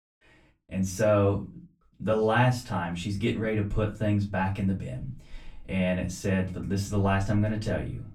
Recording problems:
off-mic speech; far
room echo; very slight; dies away in 0.3 s

